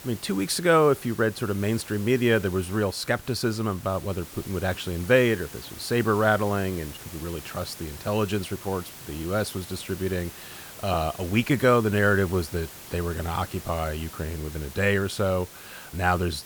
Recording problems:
hiss; noticeable; throughout; 15 dB below the speech

